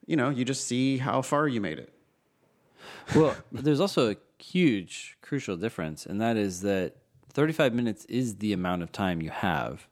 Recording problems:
none

